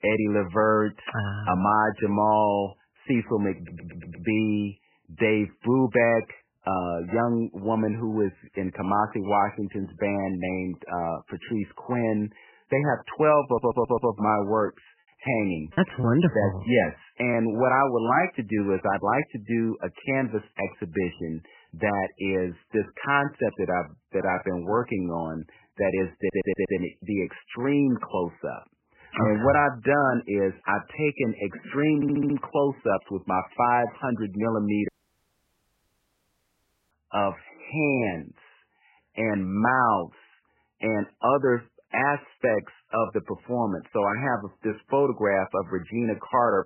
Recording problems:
garbled, watery; badly; nothing above 3 kHz
audio stuttering; 4 times, first at 3.5 s
choppy; occasionally; from 15 to 17 s; 3% of the speech affected
audio cutting out; at 35 s for 2 s

